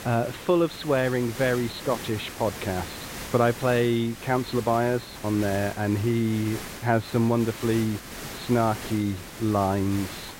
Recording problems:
high frequencies cut off; severe; nothing above 4.5 kHz
hiss; noticeable; throughout; 10 dB below the speech

